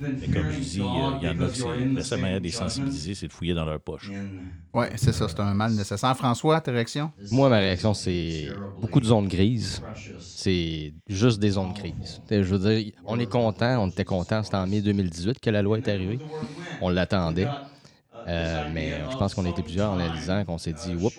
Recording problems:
voice in the background; loud; throughout; 8 dB below the speech

